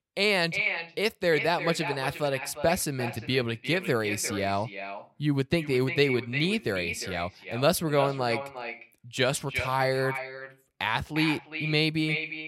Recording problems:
echo of what is said; strong; throughout; 350 ms later, 7 dB below the speech

